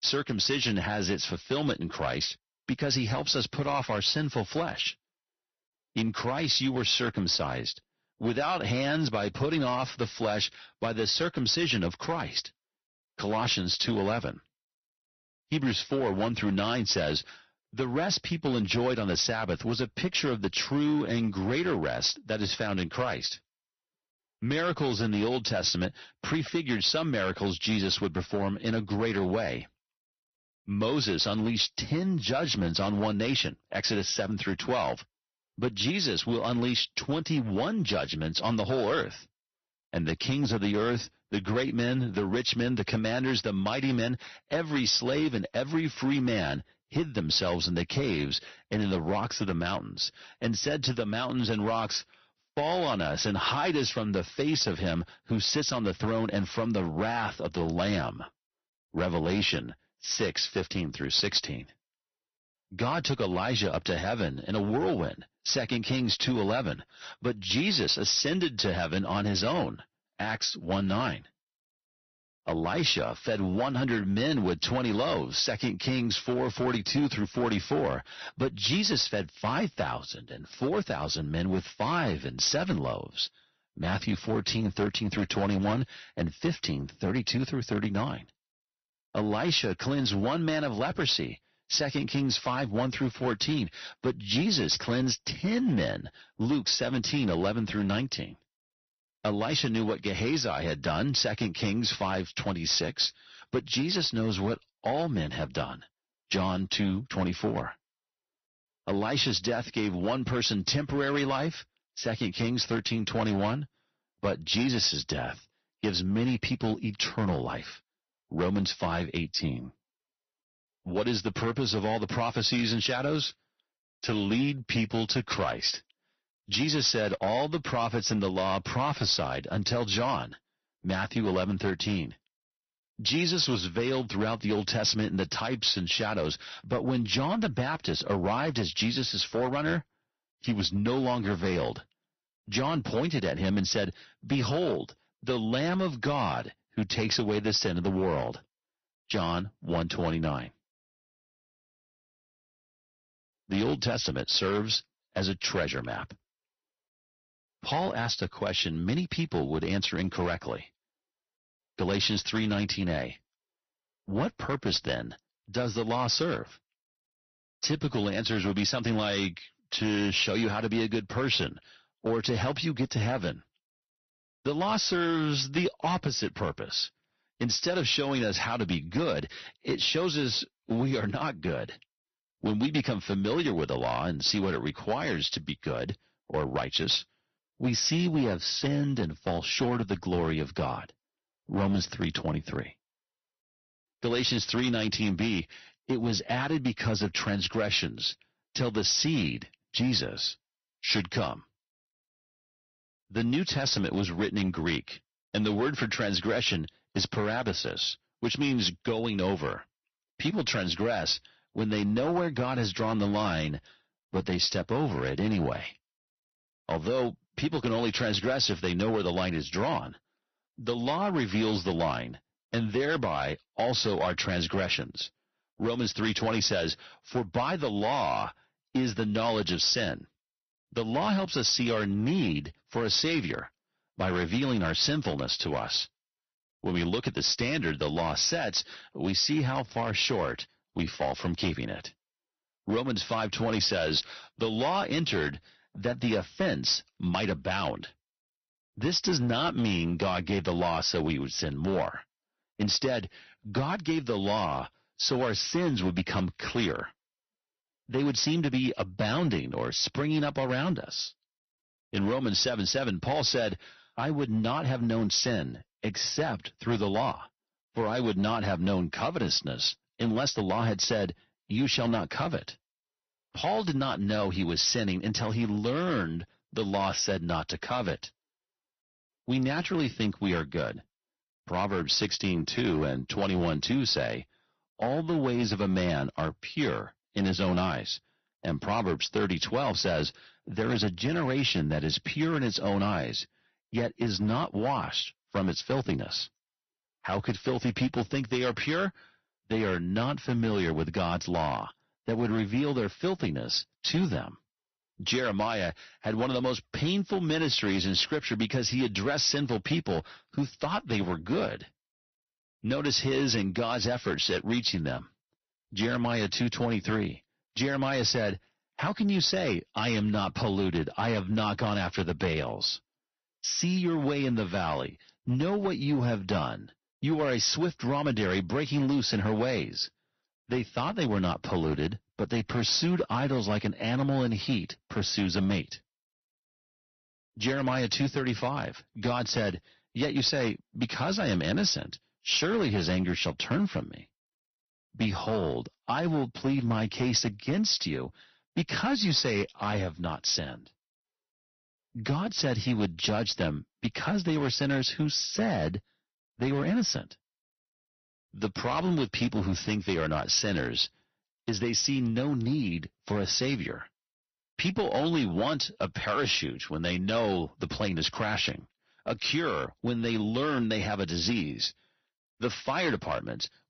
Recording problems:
distortion; slight; 5% of the sound clipped
garbled, watery; slightly; nothing above 6 kHz

